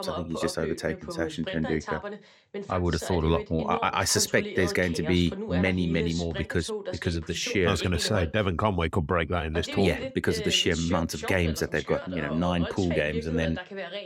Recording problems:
voice in the background; loud; throughout; 9 dB below the speech

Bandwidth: 16.5 kHz